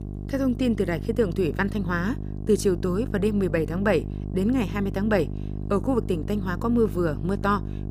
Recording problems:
electrical hum; noticeable; throughout; 50 Hz, 15 dB below the speech

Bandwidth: 15 kHz